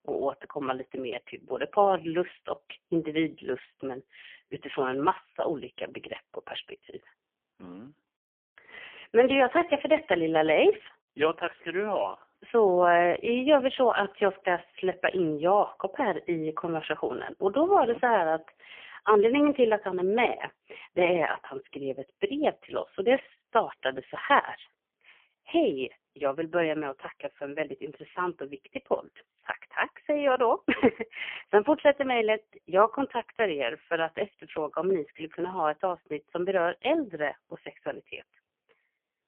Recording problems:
phone-call audio; poor line; nothing above 3.5 kHz

